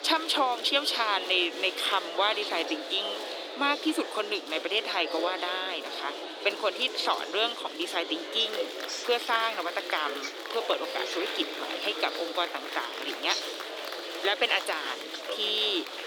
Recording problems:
thin; very; fading below 300 Hz
murmuring crowd; loud; throughout; 6 dB below the speech

